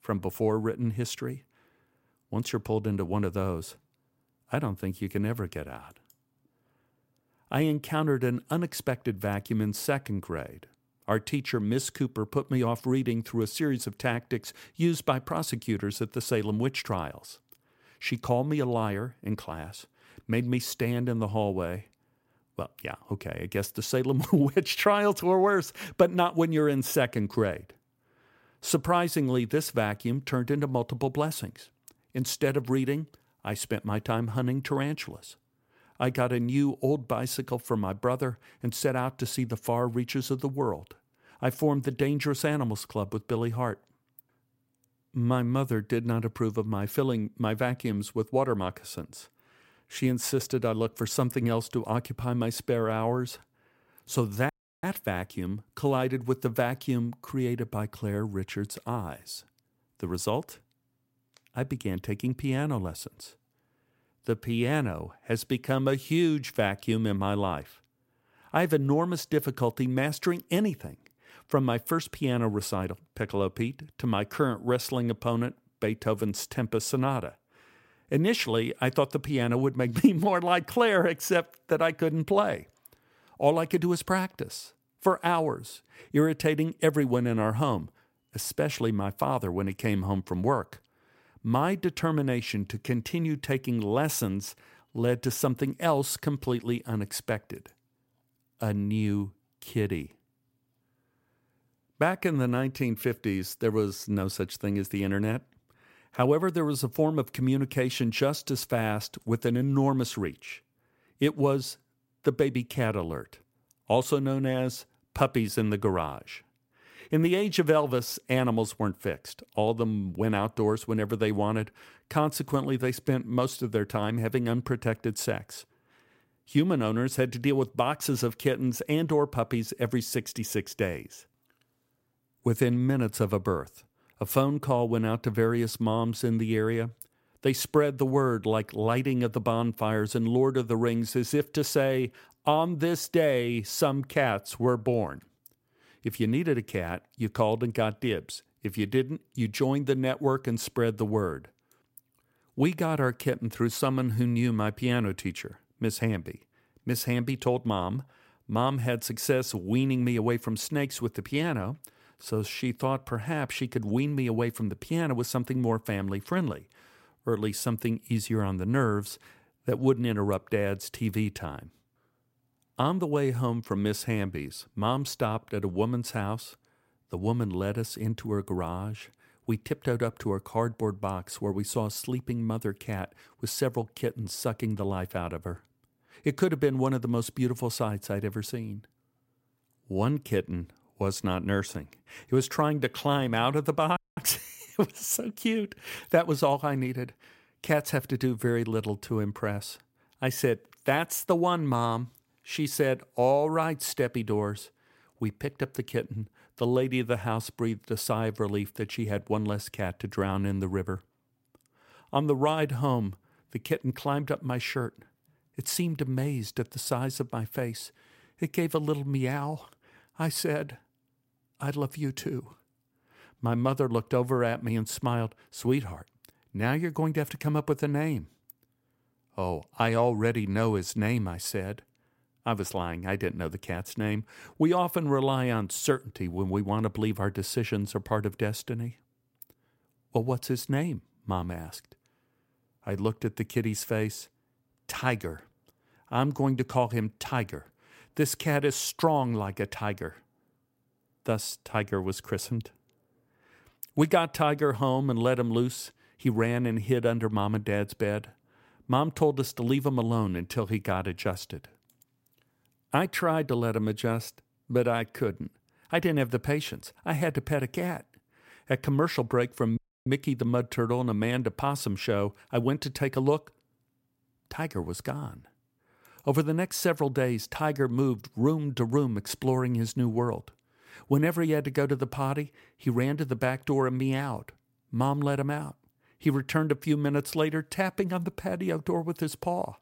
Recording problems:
audio cutting out; at 55 s, at 3:14 and at 4:30

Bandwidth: 16 kHz